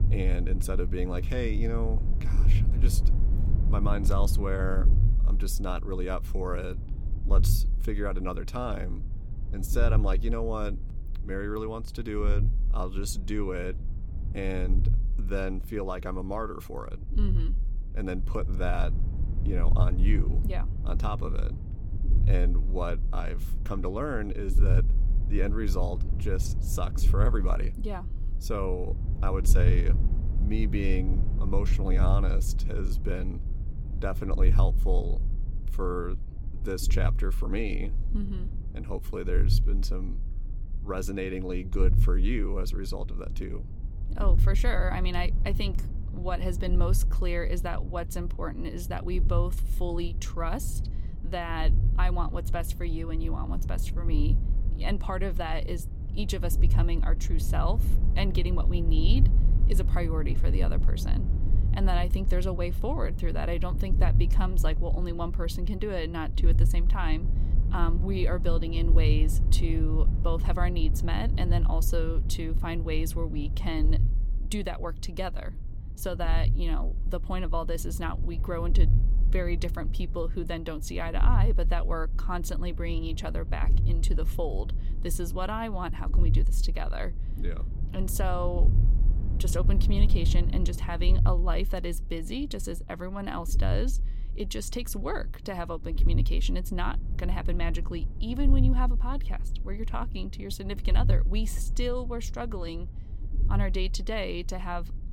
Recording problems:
low rumble; noticeable; throughout; 10 dB below the speech

